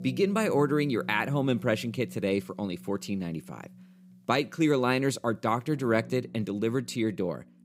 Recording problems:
background music; noticeable; throughout; 20 dB below the speech

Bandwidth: 15.5 kHz